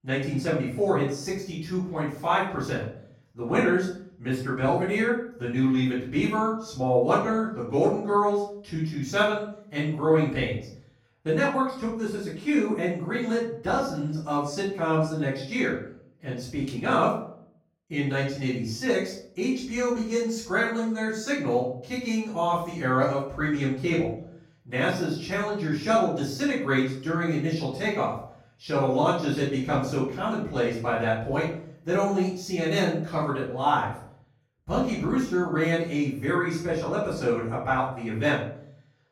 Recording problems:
off-mic speech; far
room echo; noticeable; dies away in 0.5 s

